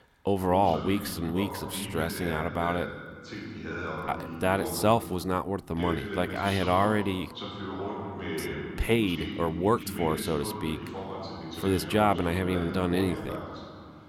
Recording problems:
voice in the background; loud; throughout; 8 dB below the speech

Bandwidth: 19 kHz